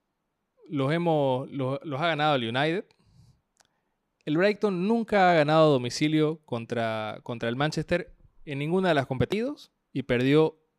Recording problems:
none

